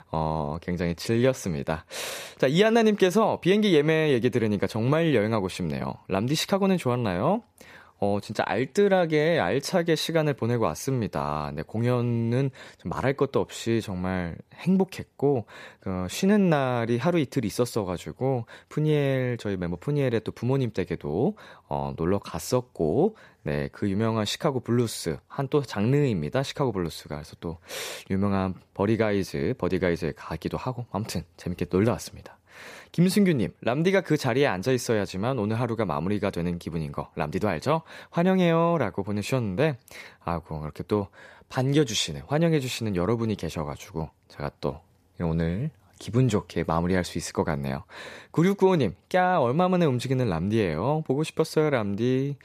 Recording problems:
none

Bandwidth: 14.5 kHz